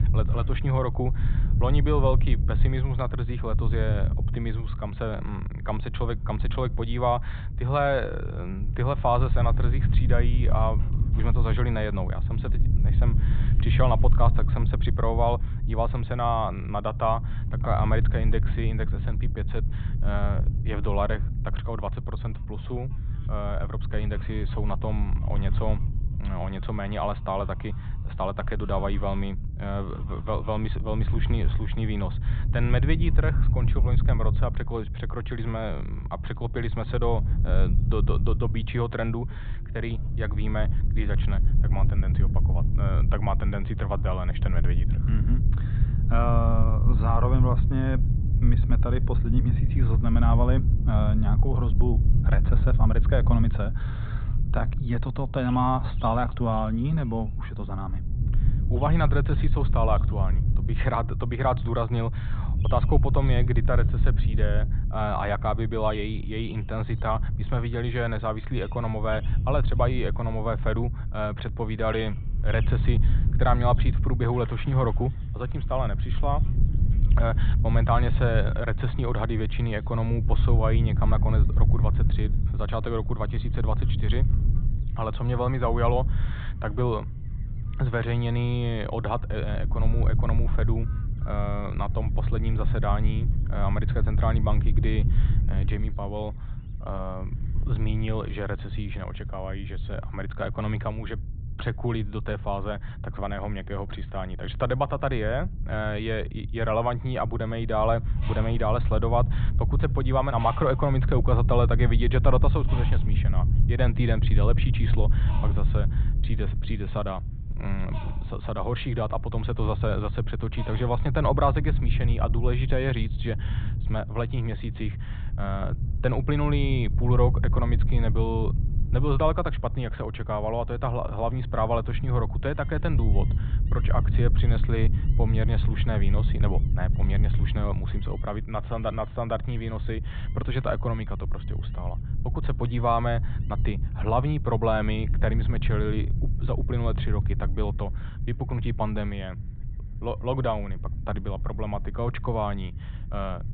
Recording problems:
high frequencies cut off; severe; nothing above 4 kHz
muffled; very slightly; fading above 3.5 kHz
low rumble; noticeable; throughout; 10 dB below the speech
animal sounds; faint; throughout; 25 dB below the speech

